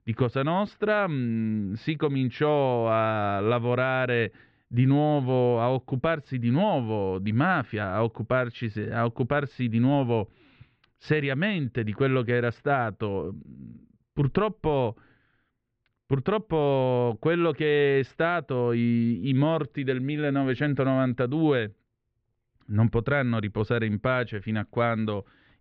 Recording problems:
muffled; very; fading above 2.5 kHz

